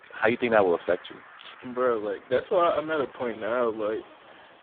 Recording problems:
phone-call audio; poor line
traffic noise; faint; throughout; 20 dB below the speech

